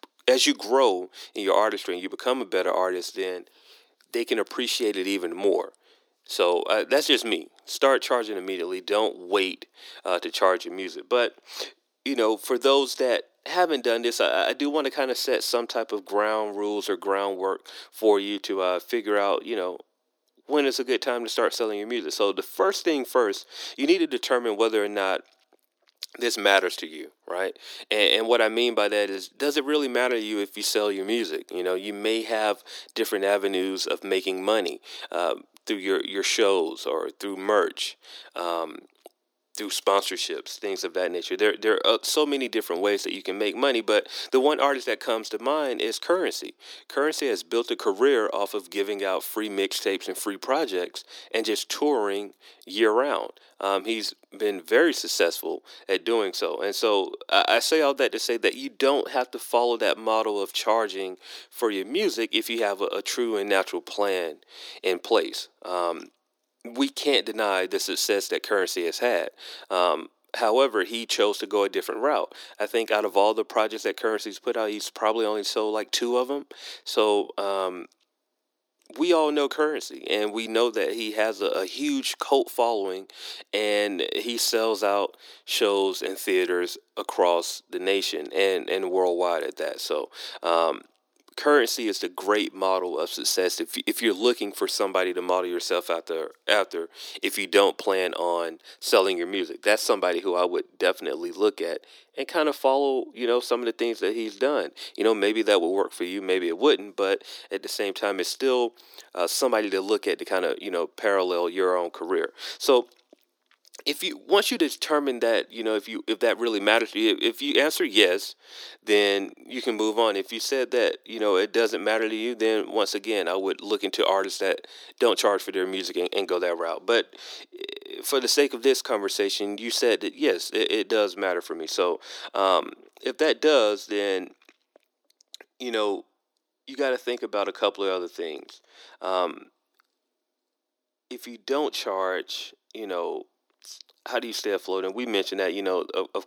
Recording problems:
thin; somewhat; fading below 300 Hz

